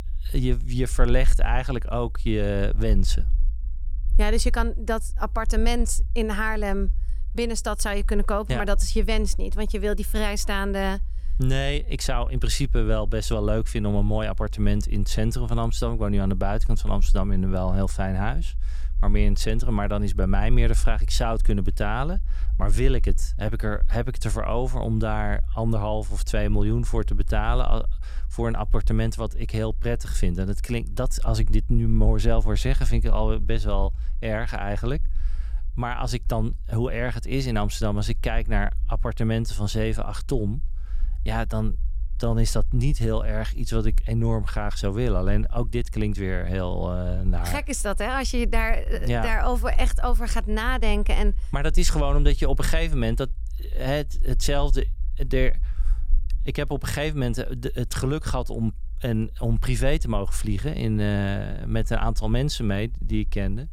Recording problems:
low rumble; faint; throughout; 25 dB below the speech

